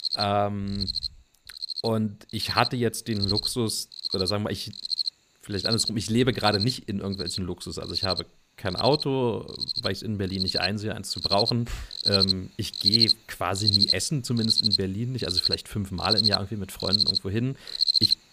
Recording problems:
animal sounds; very loud; throughout; 3 dB above the speech

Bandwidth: 15 kHz